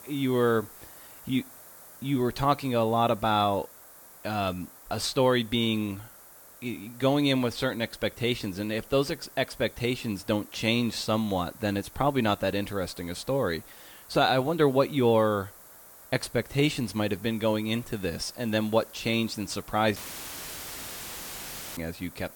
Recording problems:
hiss; noticeable; throughout; 20 dB below the speech
audio cutting out; filled with static; at 20 s for 2 s

